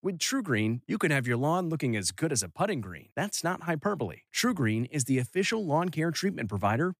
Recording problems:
none

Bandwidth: 15 kHz